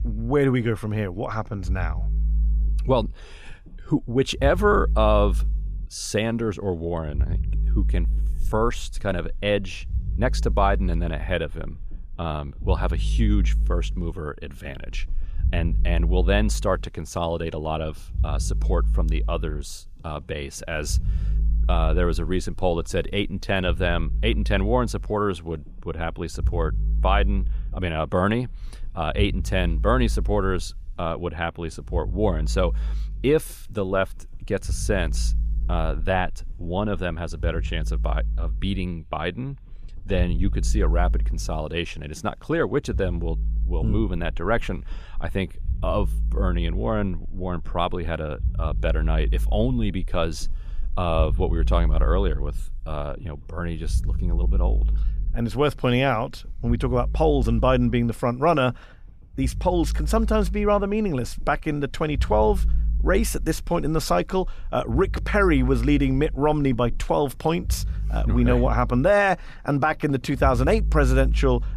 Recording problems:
low rumble; faint; throughout; 20 dB below the speech

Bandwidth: 14.5 kHz